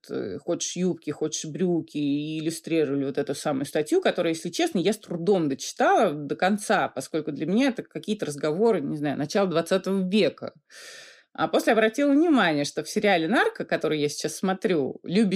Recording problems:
abrupt cut into speech; at the end

